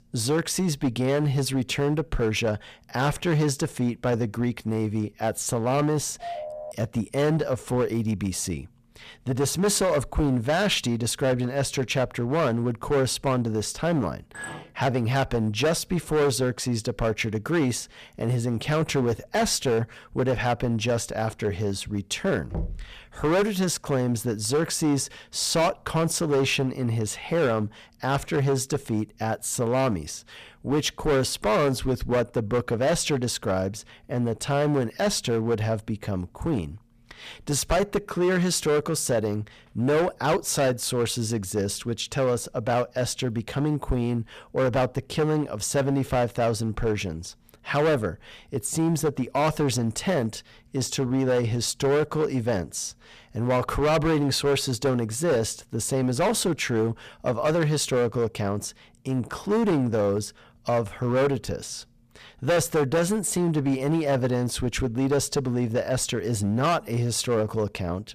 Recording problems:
distortion; heavy; 11% of the sound clipped
phone ringing; noticeable; at 6 s; peak 9 dB below the speech
clattering dishes; faint; at 14 s; peak 10 dB below the speech
door banging; noticeable; at 23 s; peak 8 dB below the speech

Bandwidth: 14.5 kHz